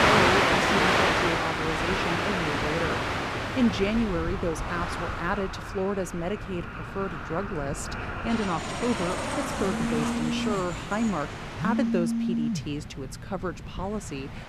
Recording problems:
train or aircraft noise; very loud; throughout; 3 dB above the speech
phone ringing; loud; from 6.5 s on; peak 4 dB above the speech

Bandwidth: 14 kHz